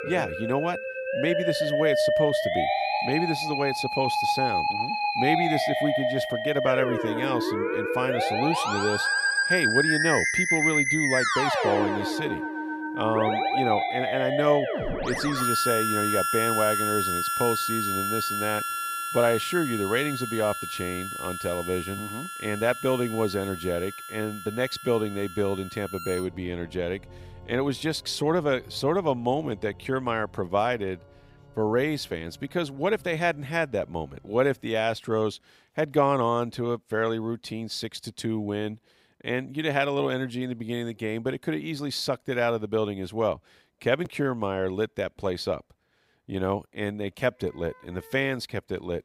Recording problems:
background music; very loud; throughout; 2 dB above the speech

